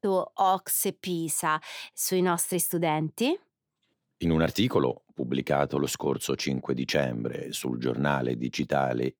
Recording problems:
none

